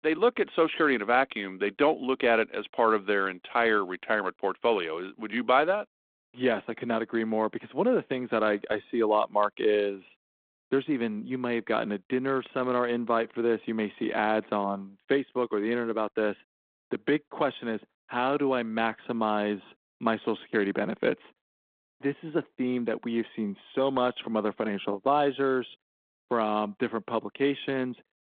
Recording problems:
phone-call audio

